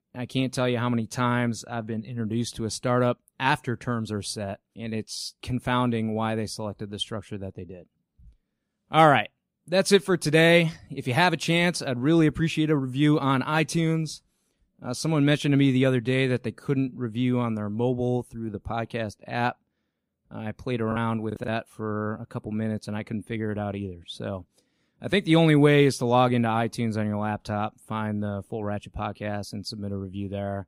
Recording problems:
choppy; very; at 21 s; 8% of the speech affected

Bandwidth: 15.5 kHz